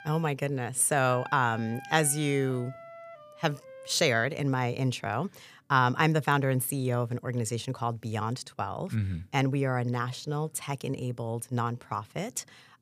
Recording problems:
background music; noticeable; throughout; 20 dB below the speech

